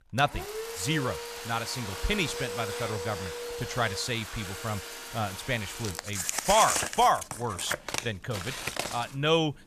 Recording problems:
household noises; loud; throughout; 4 dB below the speech

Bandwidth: 14.5 kHz